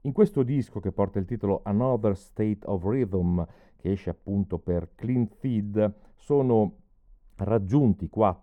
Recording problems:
muffled; very; fading above 1.5 kHz

